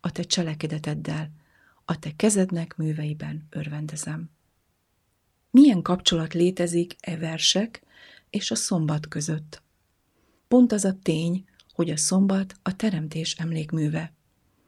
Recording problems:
none

